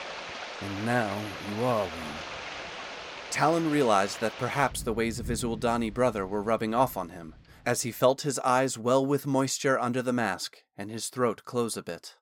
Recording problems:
rain or running water; noticeable; until 8 s; 10 dB below the speech

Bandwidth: 17 kHz